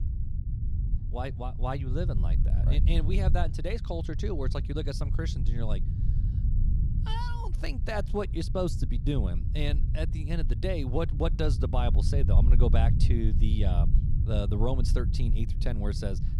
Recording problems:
low rumble; loud; throughout; 9 dB below the speech

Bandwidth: 15.5 kHz